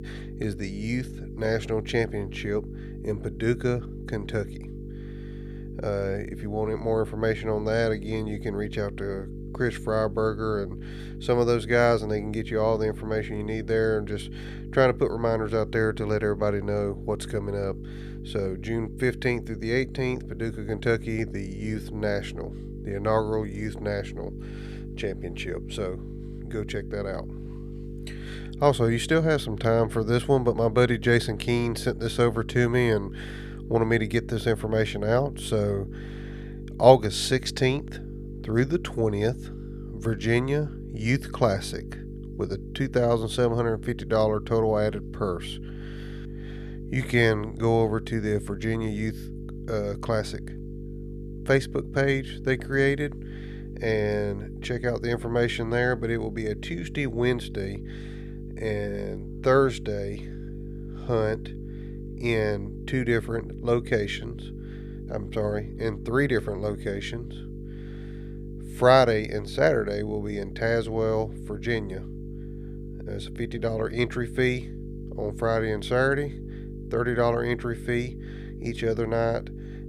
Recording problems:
electrical hum; noticeable; throughout; 50 Hz, 20 dB below the speech

